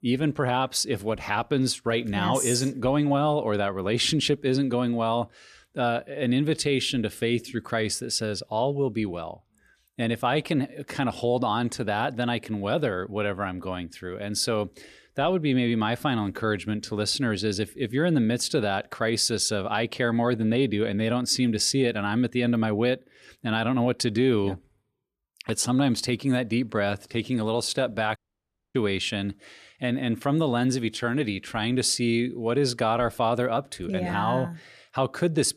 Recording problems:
audio cutting out; at 28 s for 0.5 s

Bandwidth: 14 kHz